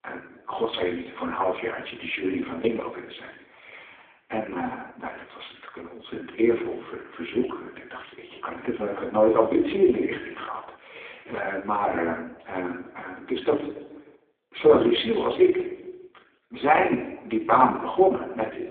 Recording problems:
phone-call audio; poor line; nothing above 3.5 kHz
room echo; noticeable; dies away in 0.9 s
off-mic speech; somewhat distant

